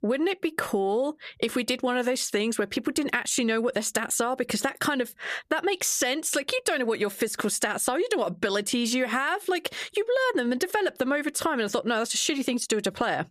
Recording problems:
squashed, flat; somewhat

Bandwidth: 14.5 kHz